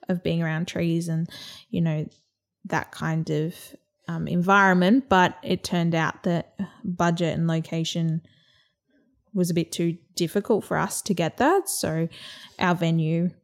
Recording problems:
none

